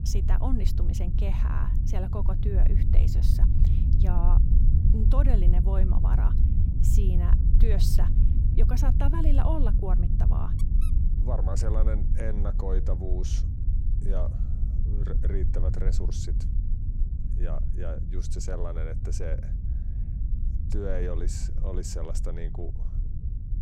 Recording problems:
low rumble; loud; throughout; 5 dB below the speech

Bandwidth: 16.5 kHz